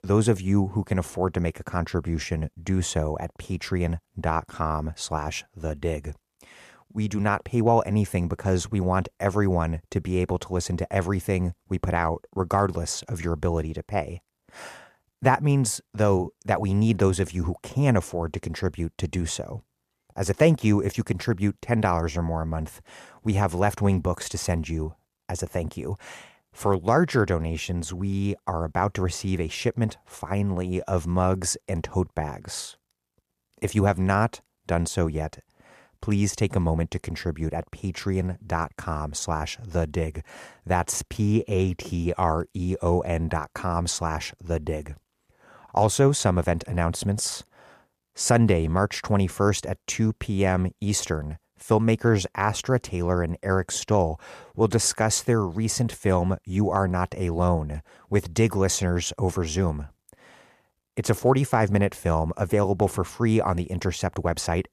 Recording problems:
none

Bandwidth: 14.5 kHz